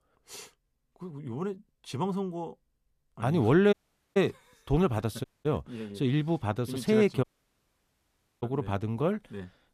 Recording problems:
audio cutting out; at 3.5 s, at 5 s and at 7 s for 1 s

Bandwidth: 14.5 kHz